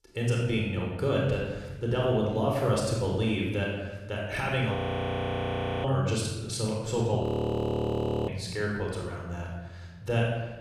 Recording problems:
room echo; strong; dies away in 1.1 s
off-mic speech; far
audio freezing; at 5 s for 1 s and at 7 s for 1 s

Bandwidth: 14.5 kHz